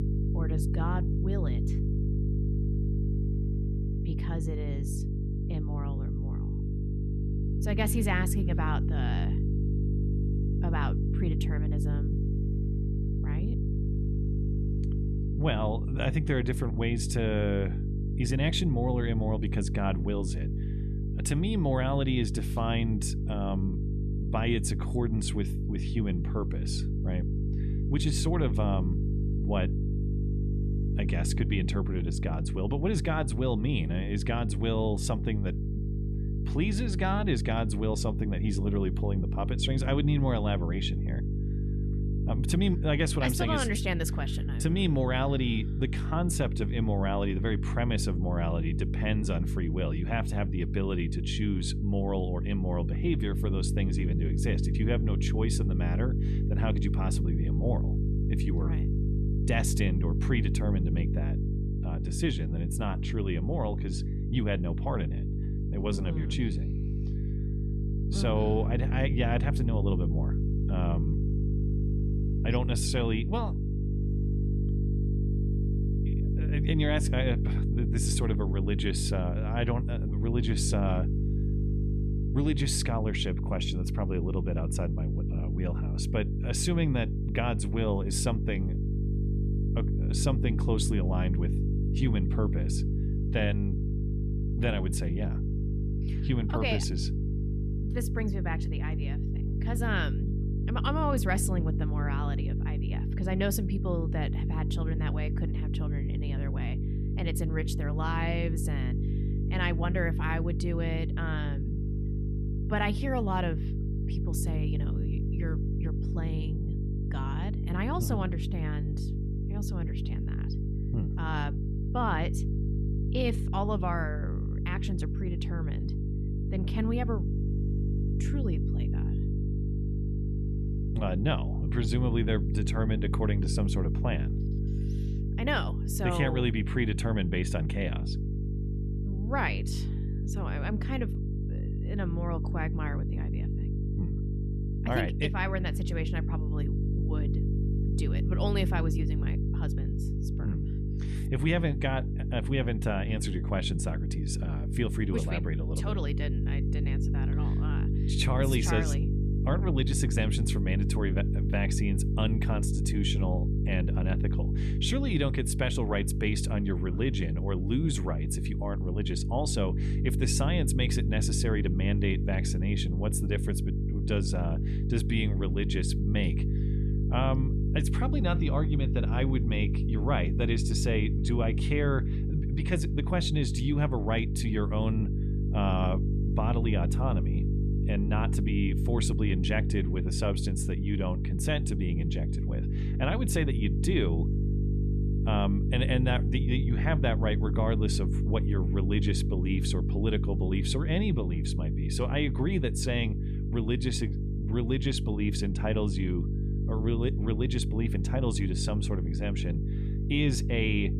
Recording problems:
electrical hum; loud; throughout; 50 Hz, 7 dB below the speech

